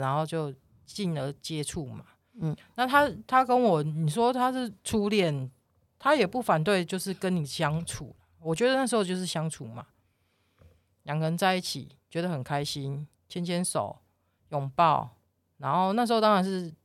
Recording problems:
abrupt cut into speech; at the start

